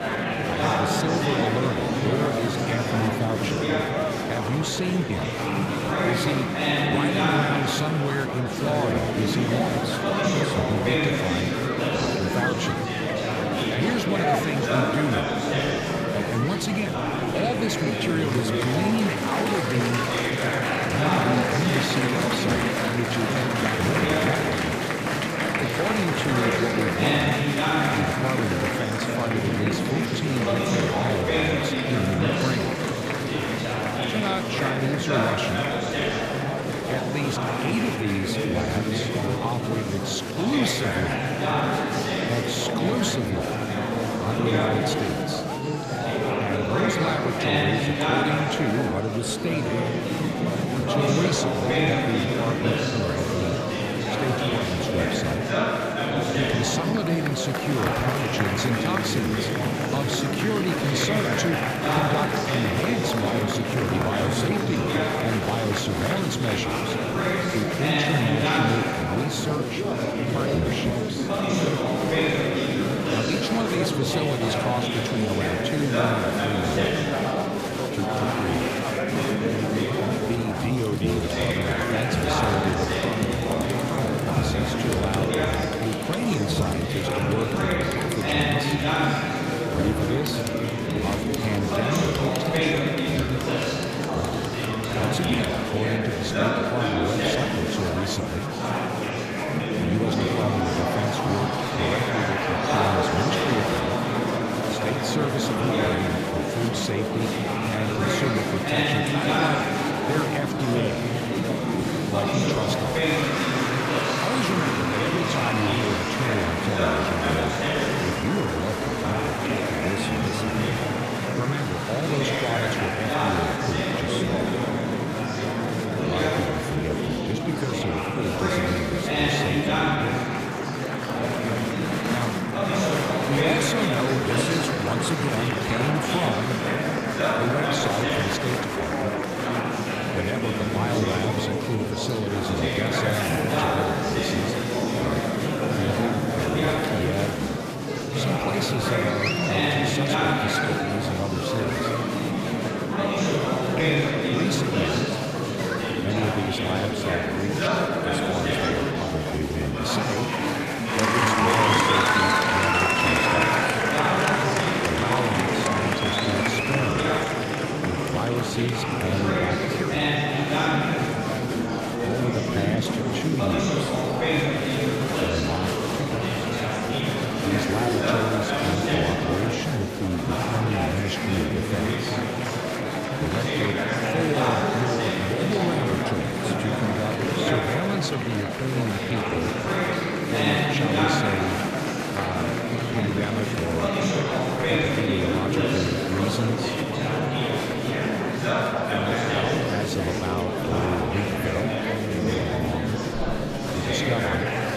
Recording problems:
murmuring crowd; very loud; throughout; 5 dB above the speech

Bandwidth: 14.5 kHz